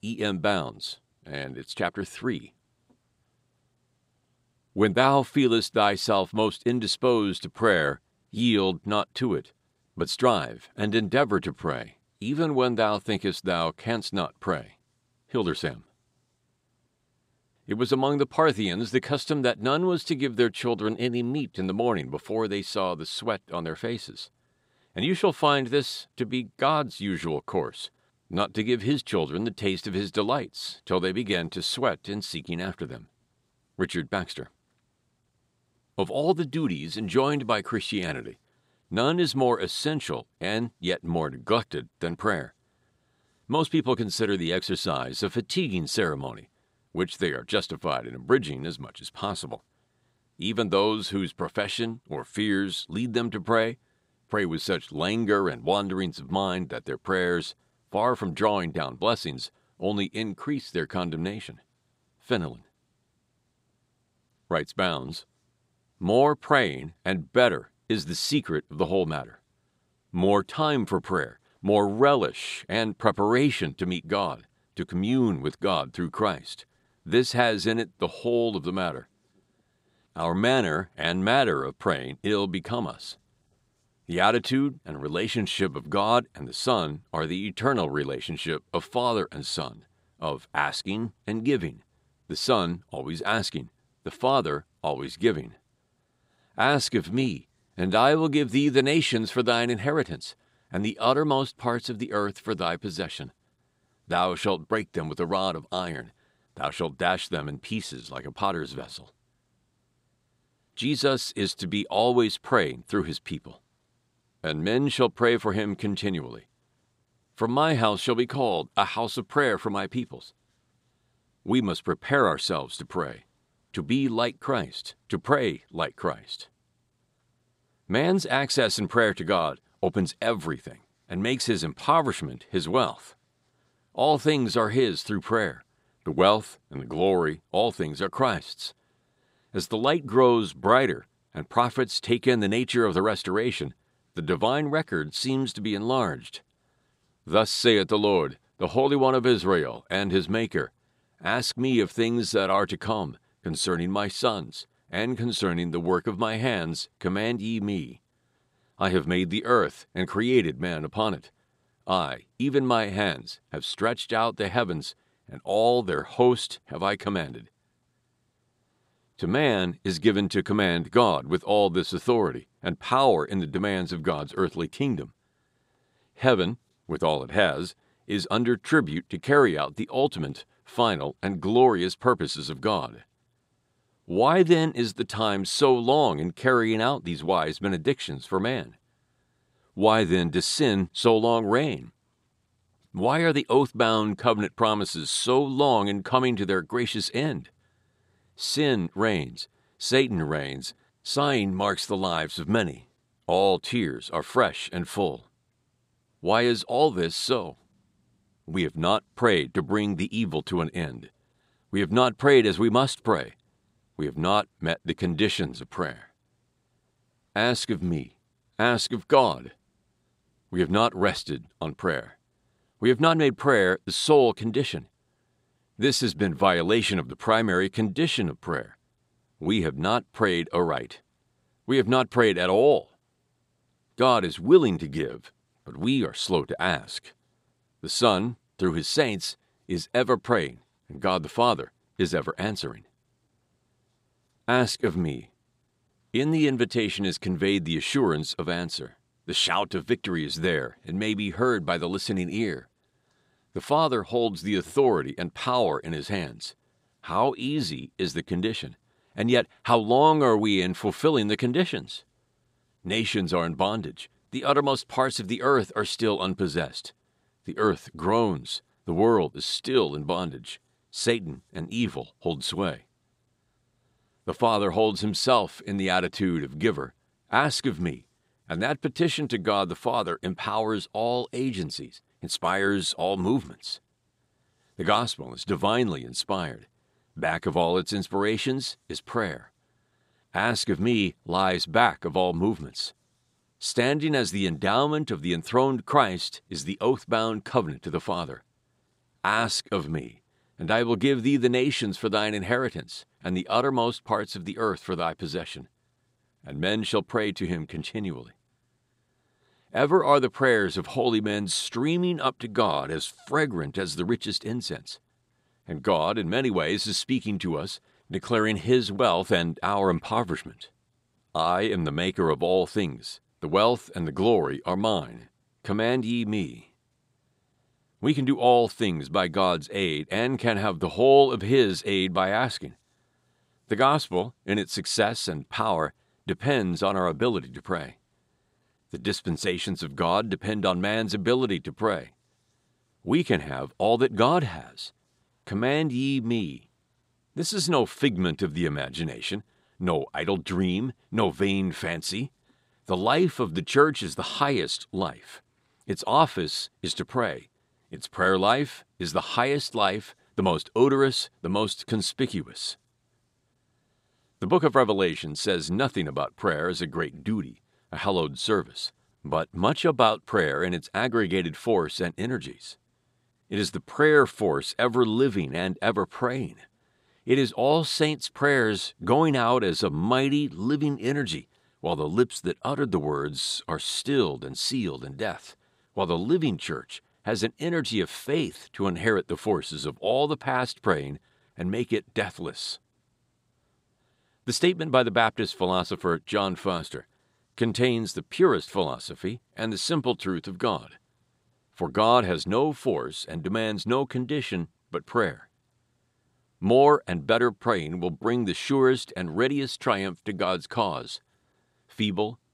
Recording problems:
none

